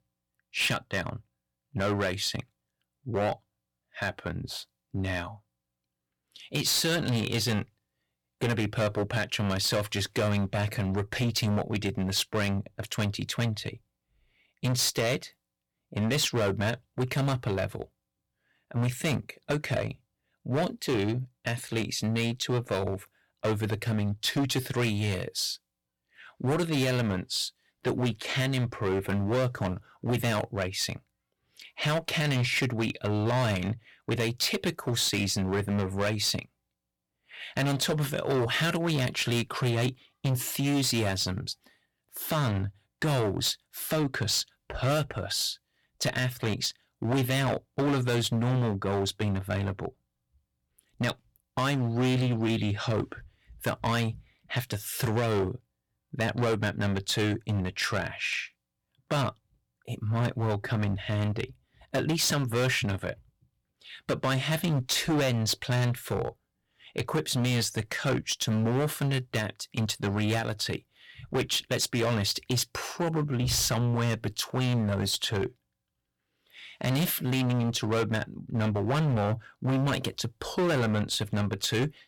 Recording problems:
distortion; heavy; 12% of the sound clipped

